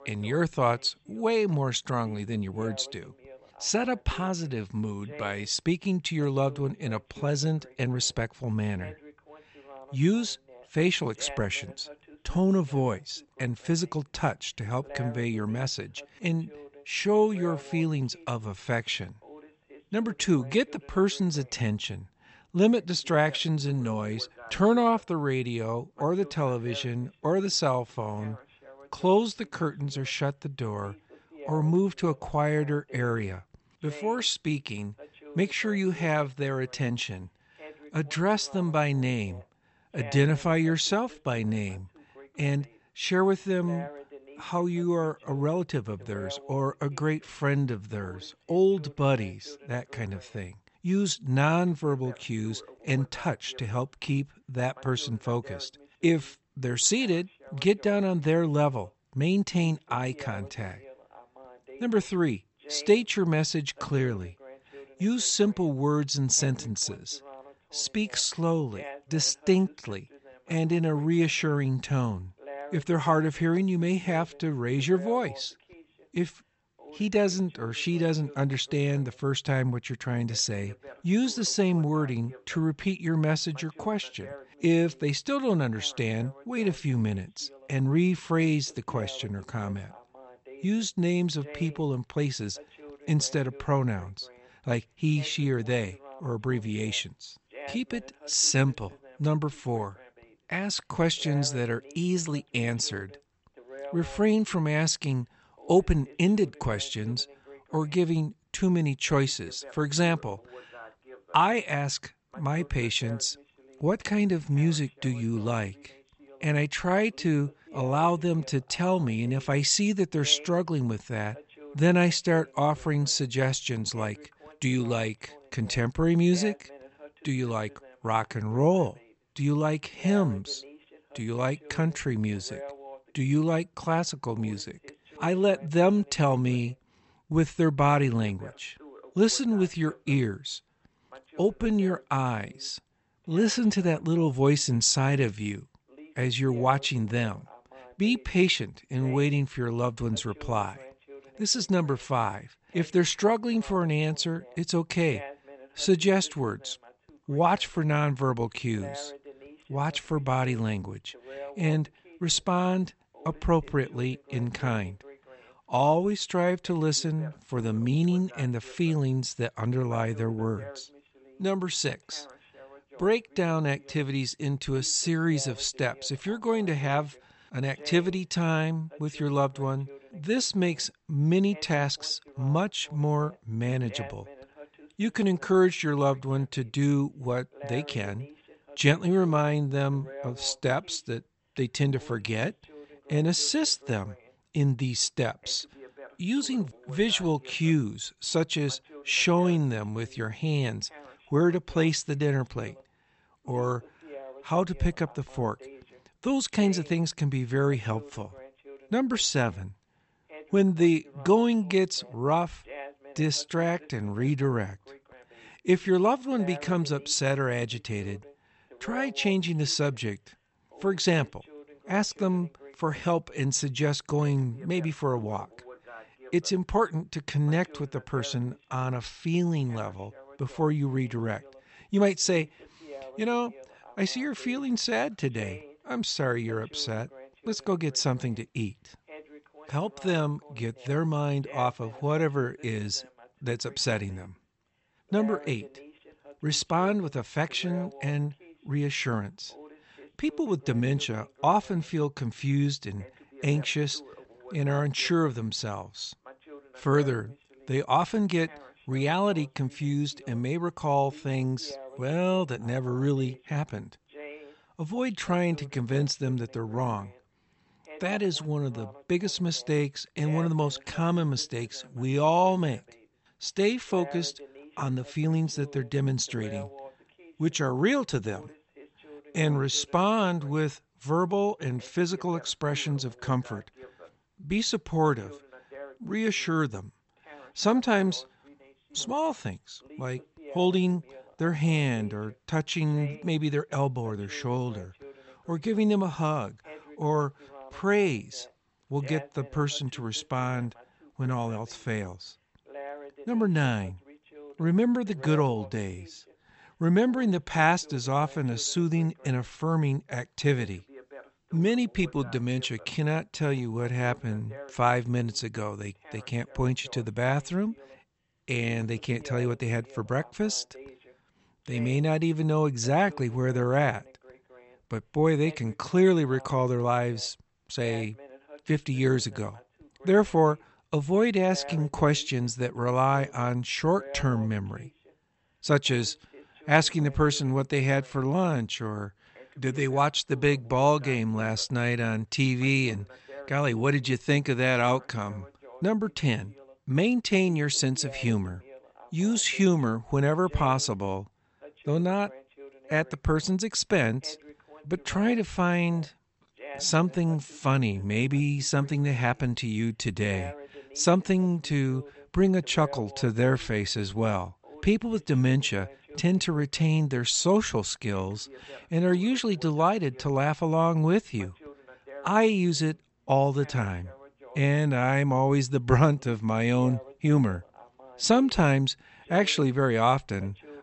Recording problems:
high frequencies cut off; noticeable; nothing above 8 kHz
voice in the background; faint; throughout; 20 dB below the speech

